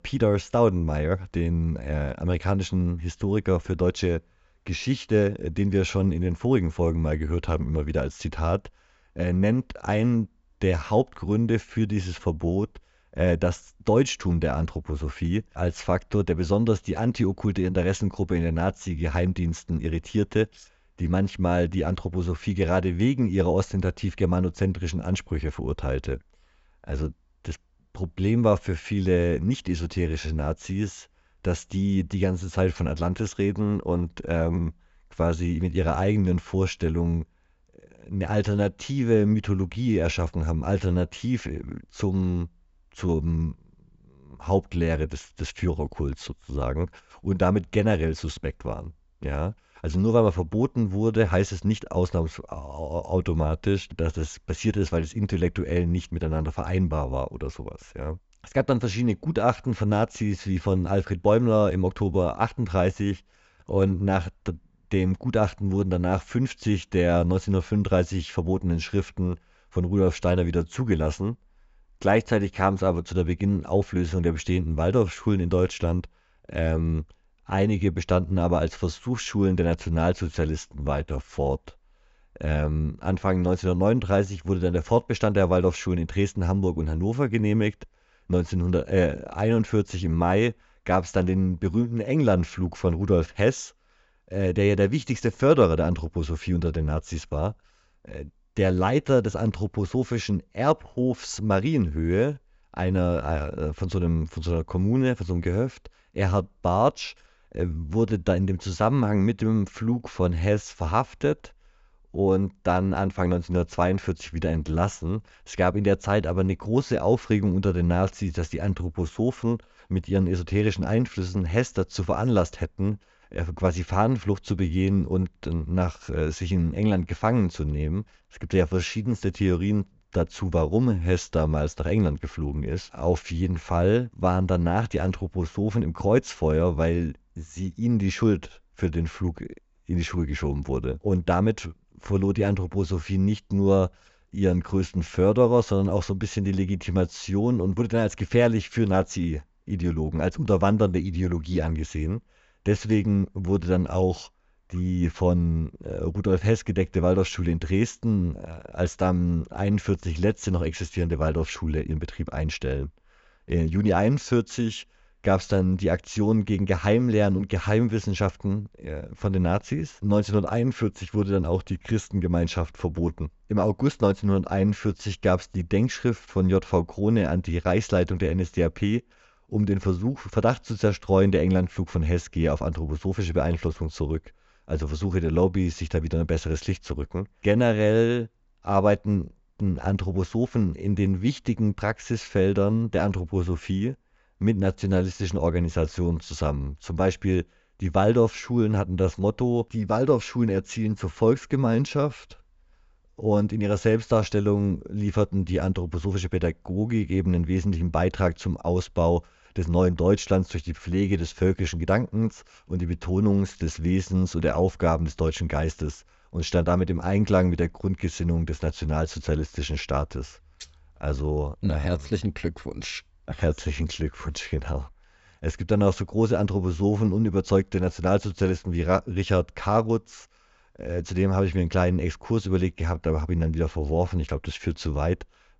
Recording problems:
high frequencies cut off; noticeable; nothing above 7.5 kHz

